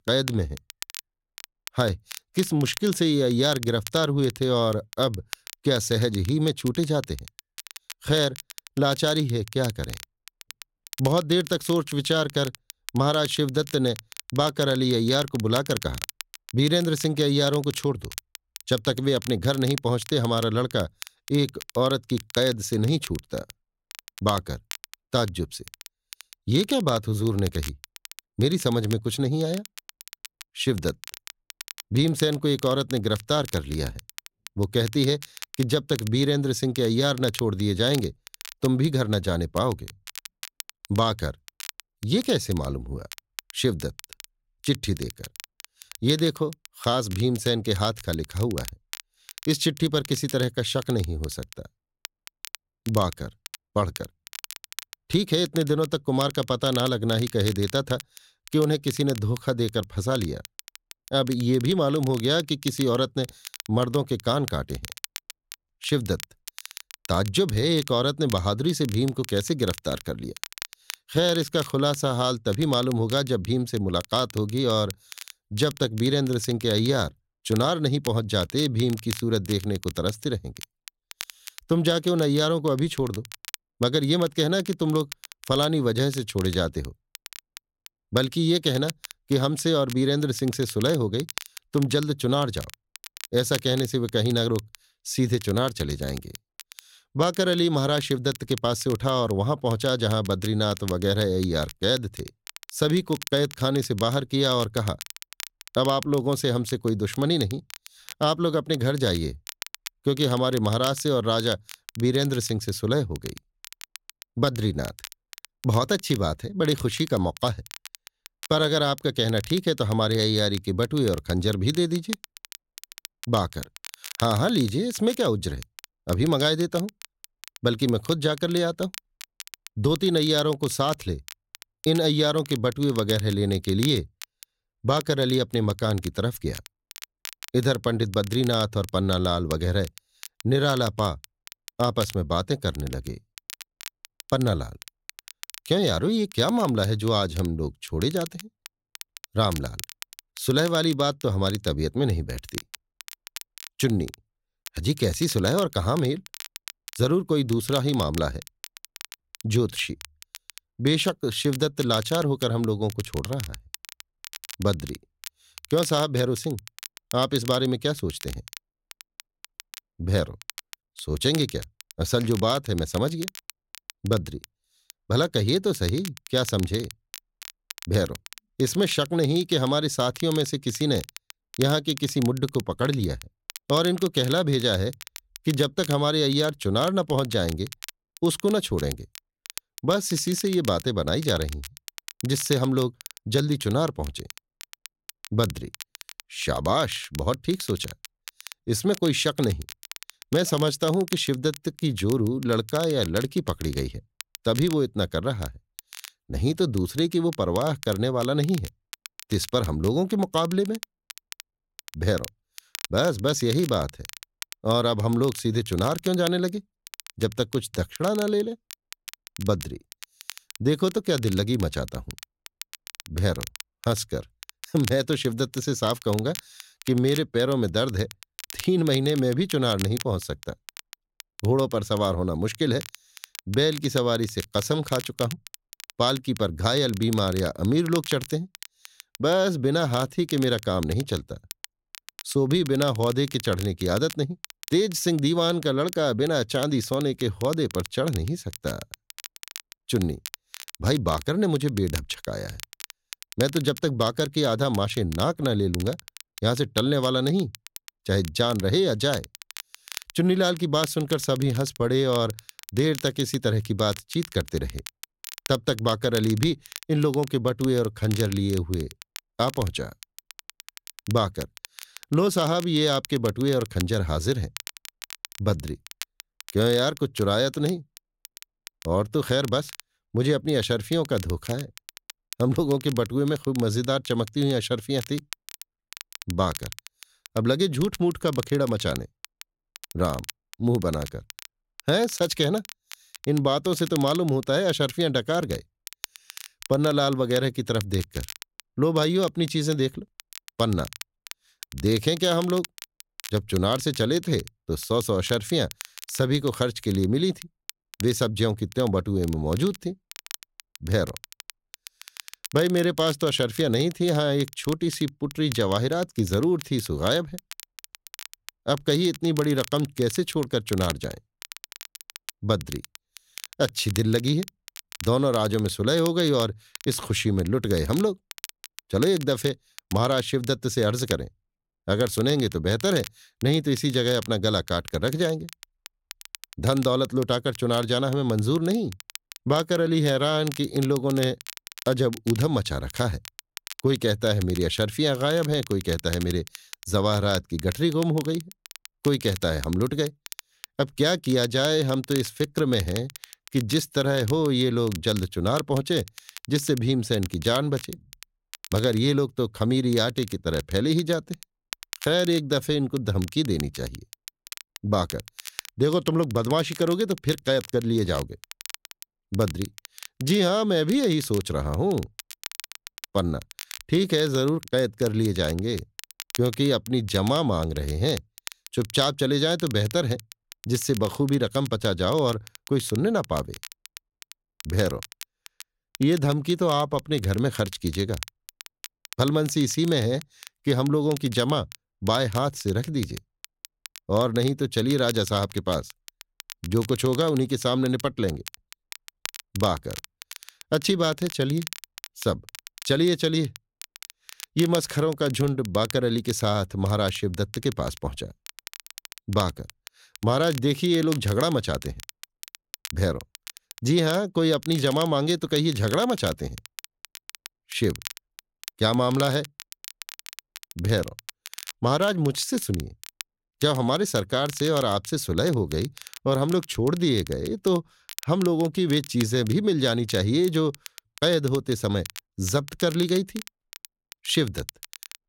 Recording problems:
crackle, like an old record; noticeable; 15 dB below the speech

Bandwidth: 16 kHz